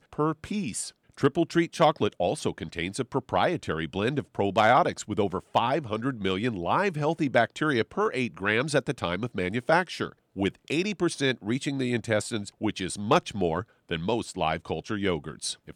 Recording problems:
none

